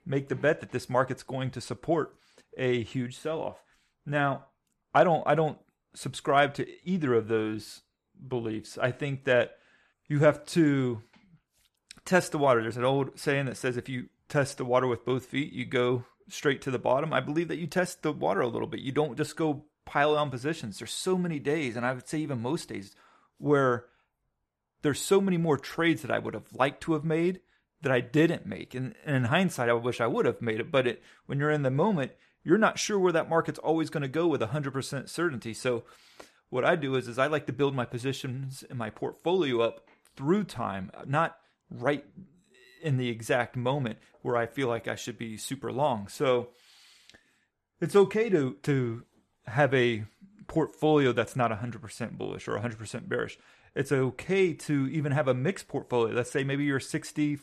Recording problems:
none

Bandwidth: 13.5 kHz